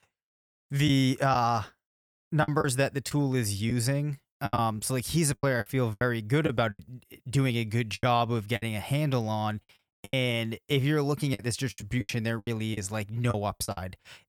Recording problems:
choppy; very; 10% of the speech affected

